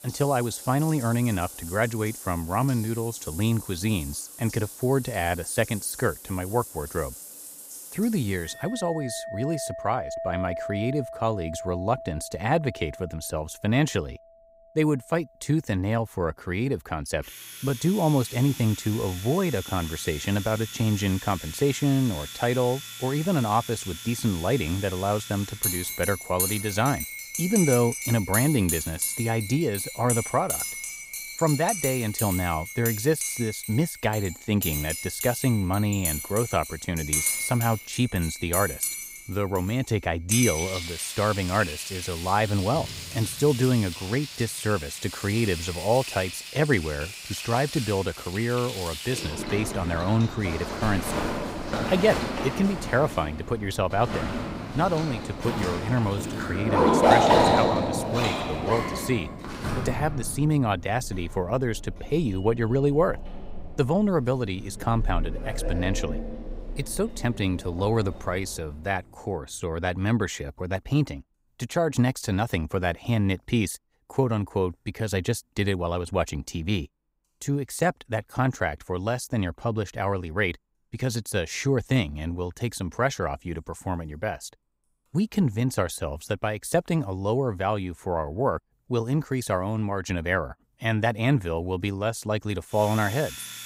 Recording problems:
household noises; loud; throughout; 4 dB below the speech

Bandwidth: 15.5 kHz